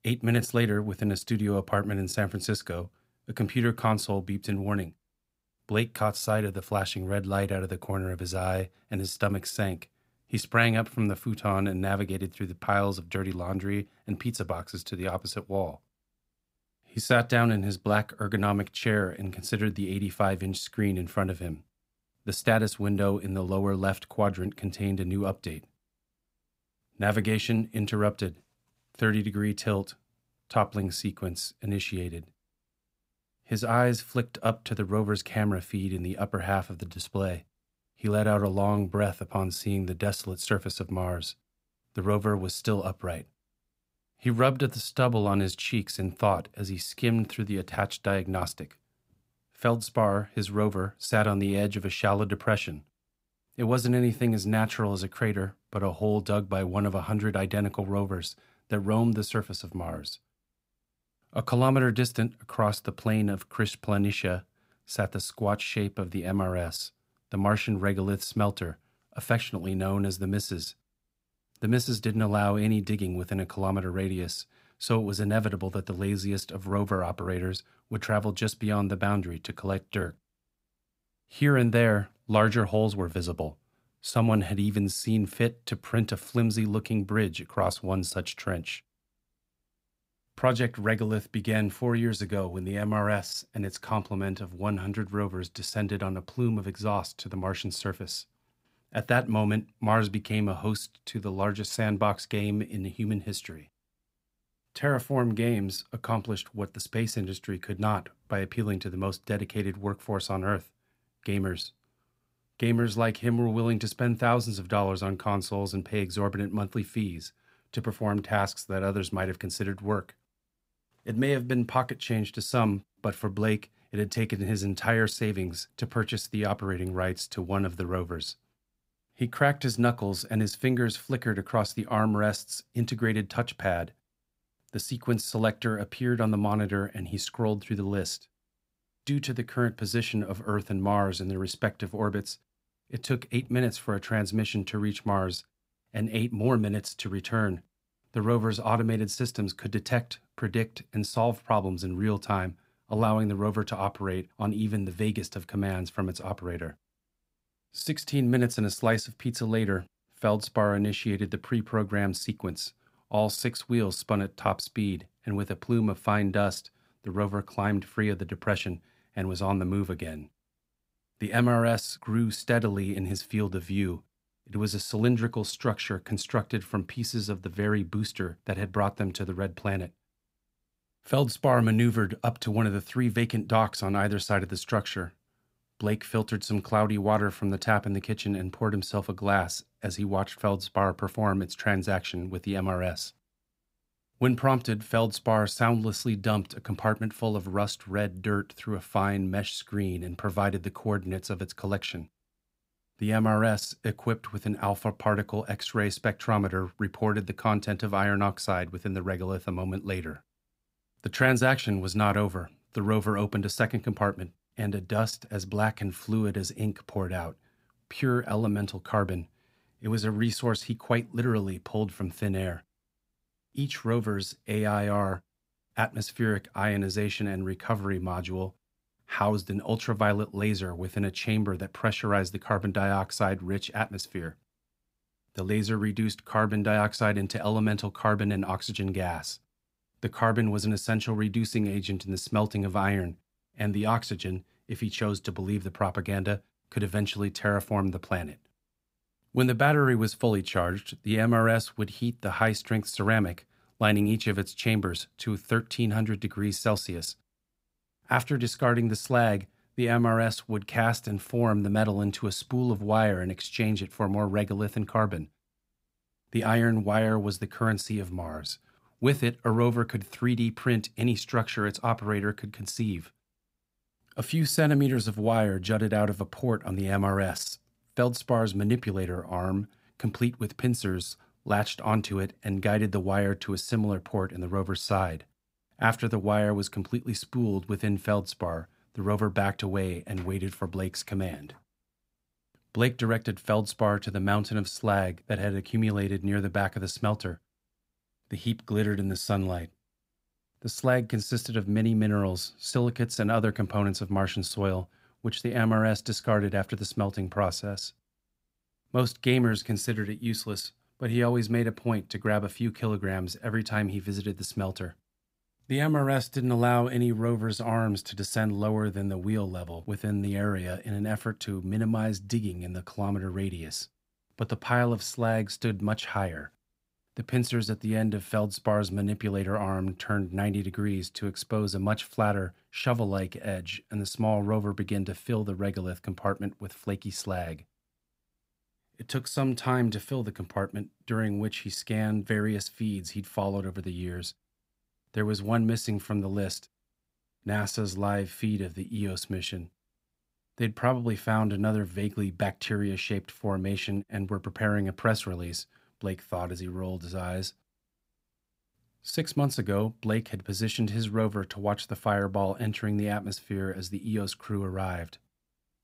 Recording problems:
none

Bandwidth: 15.5 kHz